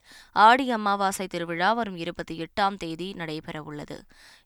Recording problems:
none

